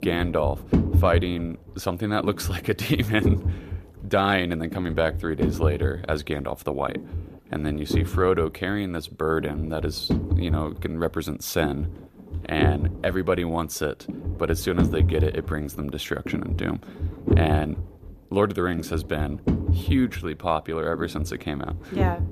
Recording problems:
low rumble; loud; throughout; 9 dB below the speech

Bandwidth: 14.5 kHz